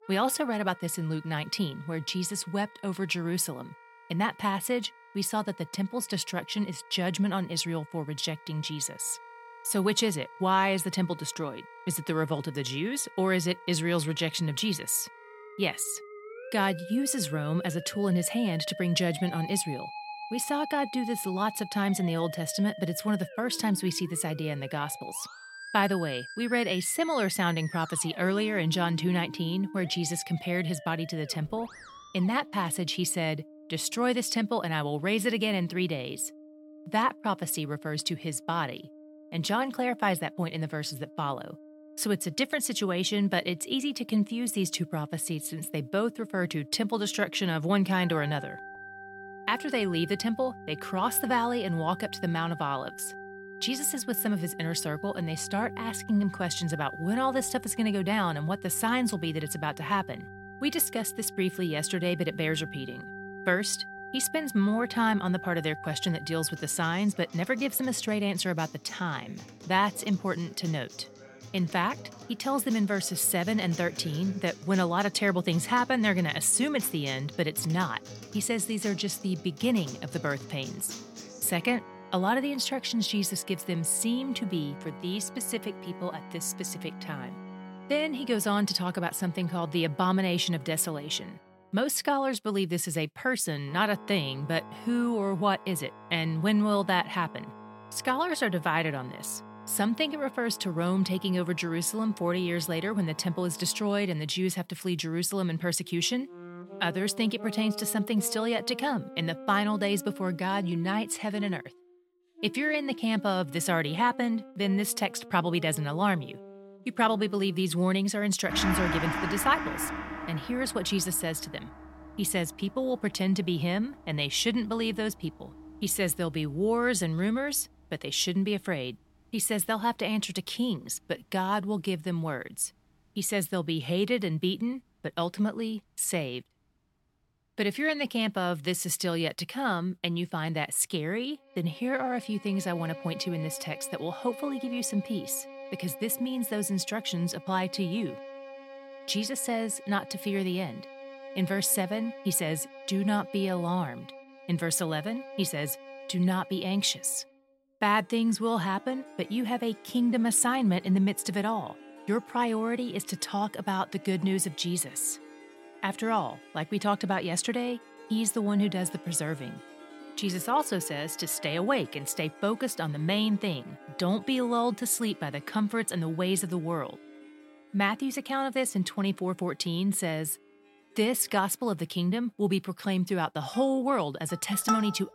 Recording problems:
background music; noticeable; throughout; 15 dB below the speech

